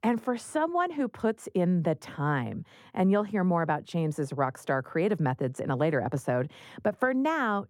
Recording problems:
muffled; slightly; fading above 2 kHz

